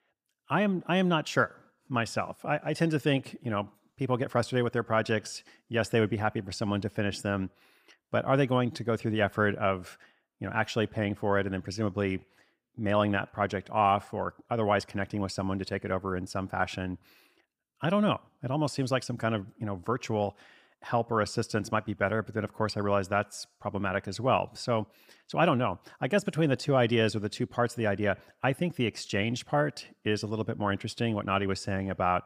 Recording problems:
none

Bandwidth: 15 kHz